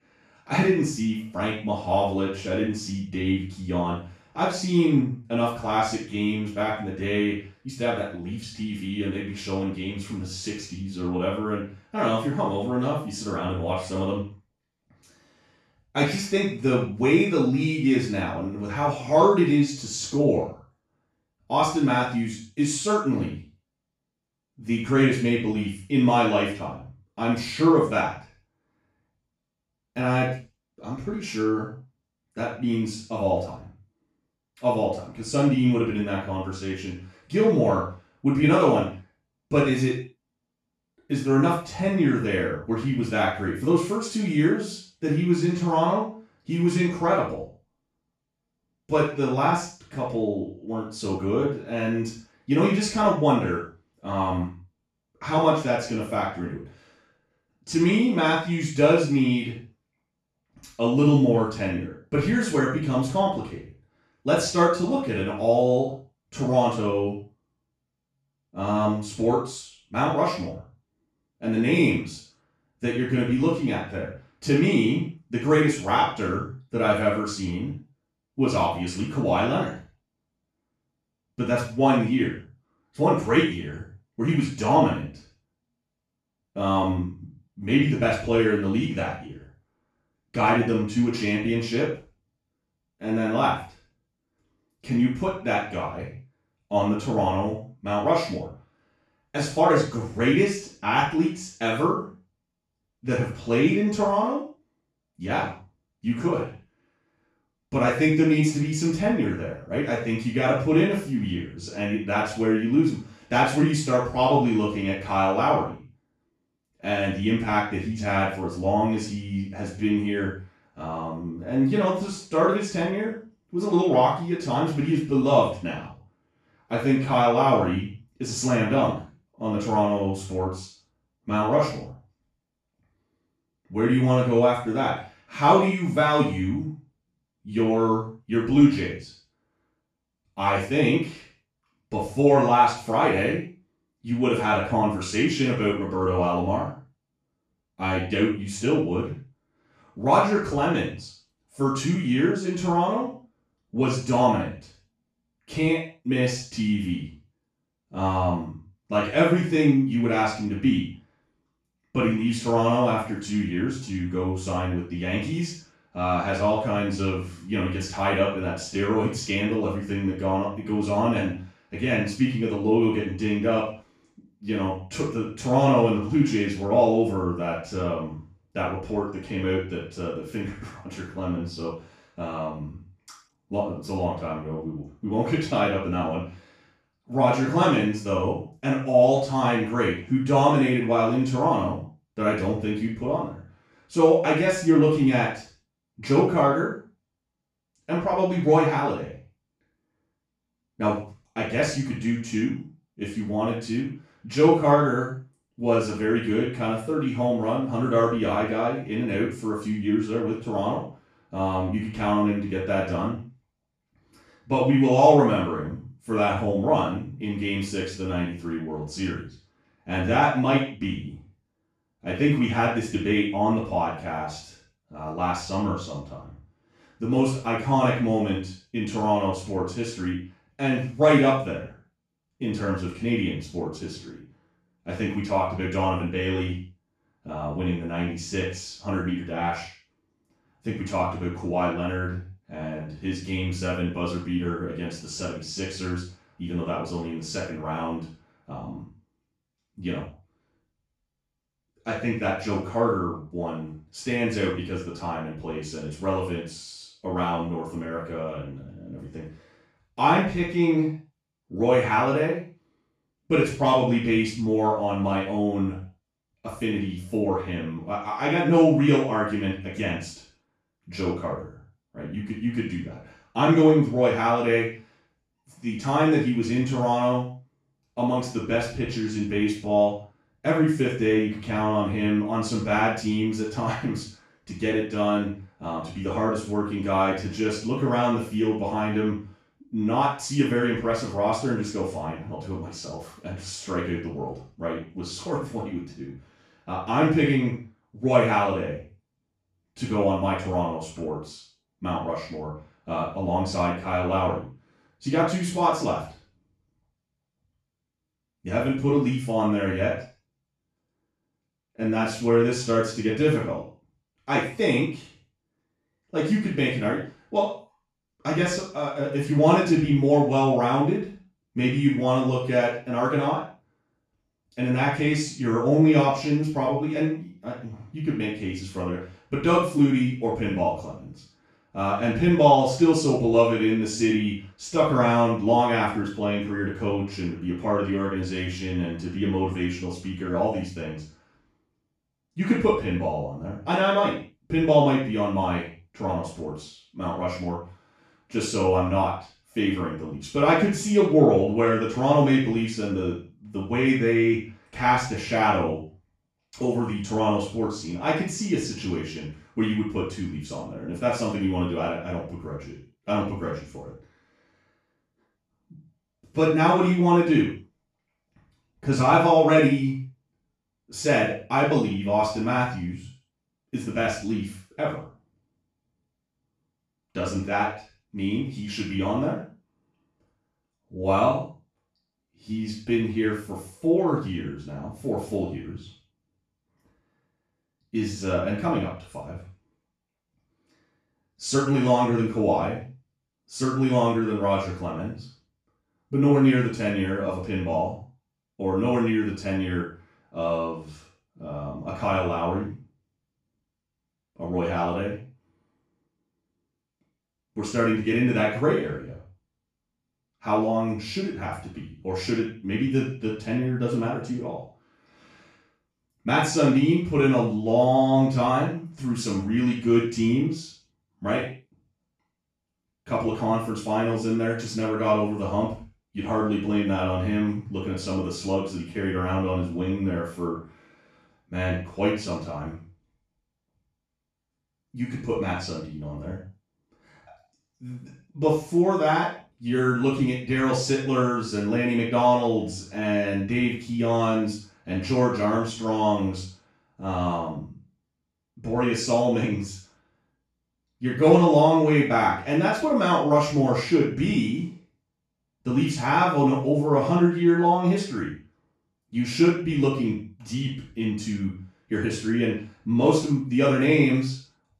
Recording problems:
off-mic speech; far
room echo; noticeable; dies away in 0.4 s

